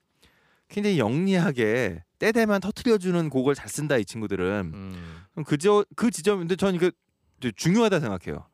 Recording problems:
none

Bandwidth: 15 kHz